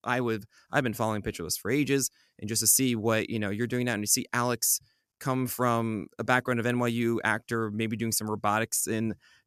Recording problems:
none

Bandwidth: 14.5 kHz